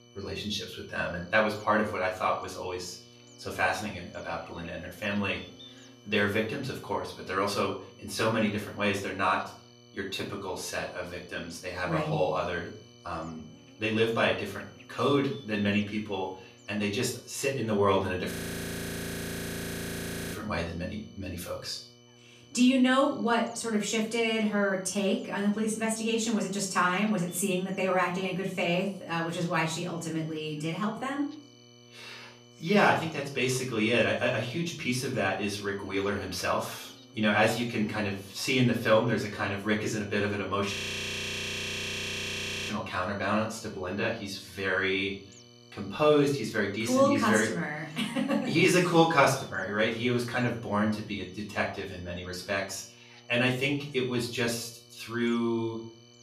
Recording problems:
off-mic speech; far
room echo; slight; dies away in 0.4 s
electrical hum; faint; throughout; 60 Hz, 25 dB below the speech
high-pitched whine; faint; throughout; 3 kHz, 30 dB below the speech
audio freezing; at 18 s for 2 s and at 41 s for 2 s

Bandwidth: 14.5 kHz